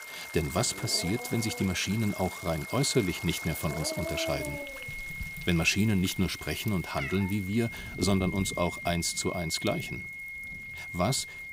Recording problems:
high-pitched whine; loud; throughout; 2 kHz, 10 dB below the speech
animal sounds; noticeable; until 8.5 s; 10 dB below the speech
rain or running water; noticeable; throughout; 15 dB below the speech

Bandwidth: 15.5 kHz